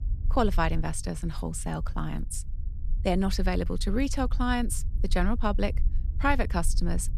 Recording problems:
low rumble; faint; throughout; 20 dB below the speech

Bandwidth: 13.5 kHz